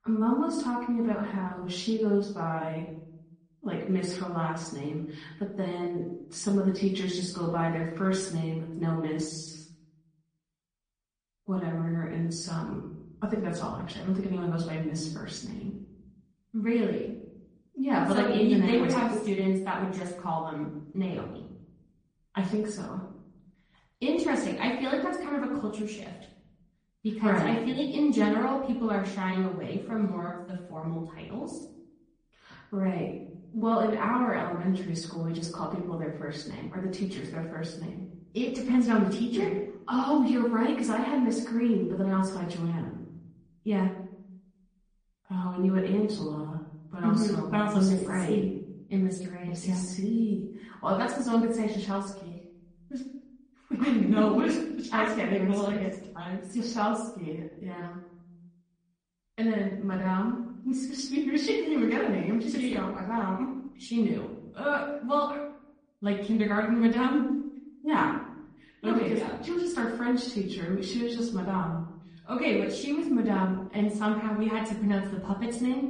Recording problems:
off-mic speech; far
room echo; slight; dies away in 0.7 s
garbled, watery; slightly; nothing above 9.5 kHz

